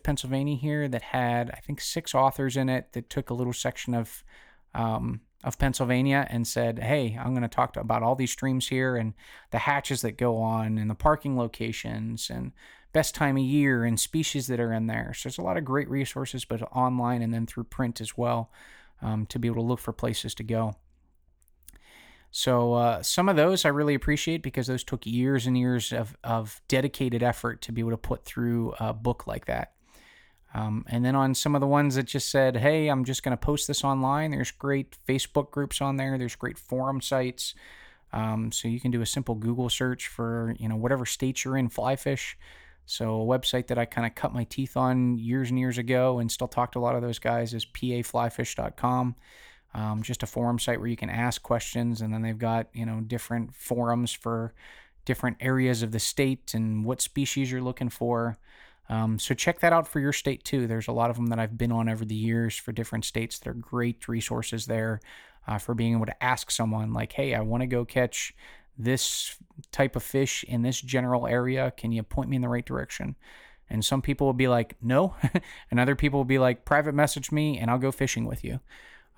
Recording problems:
none

